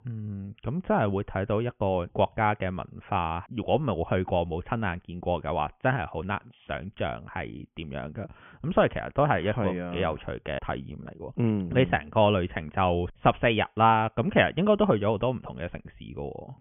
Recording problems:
high frequencies cut off; severe; nothing above 3.5 kHz

